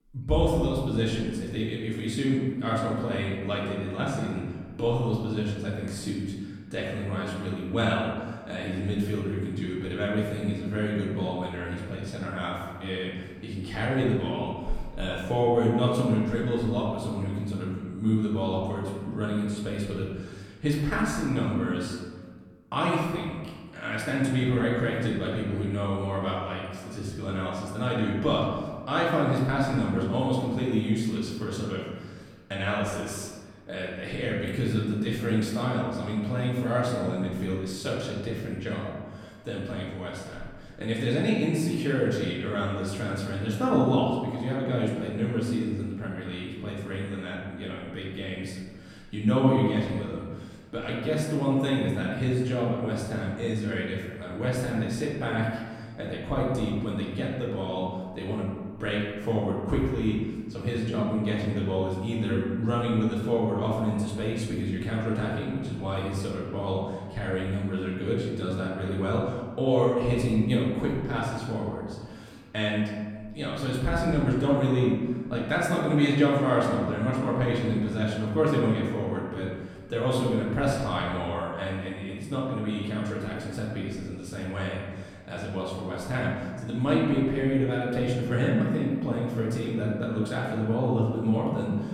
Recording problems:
off-mic speech; far
room echo; noticeable; dies away in 1.4 s

